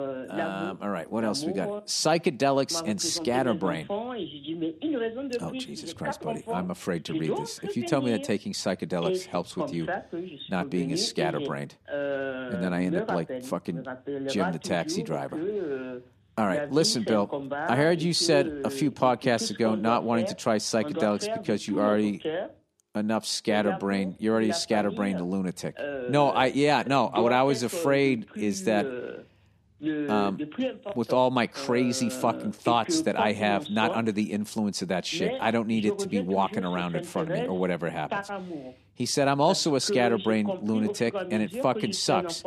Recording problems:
voice in the background; loud; throughout; 7 dB below the speech

